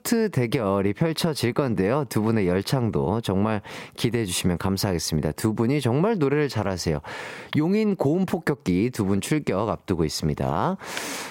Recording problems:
squashed, flat; somewhat

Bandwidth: 16 kHz